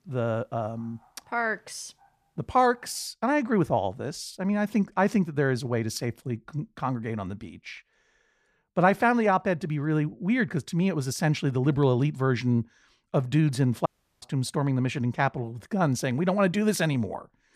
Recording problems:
audio cutting out; at 14 s

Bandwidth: 14.5 kHz